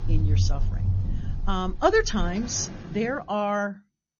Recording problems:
garbled, watery; slightly; nothing above 6.5 kHz
rain or running water; loud; until 3 s; 3 dB below the speech

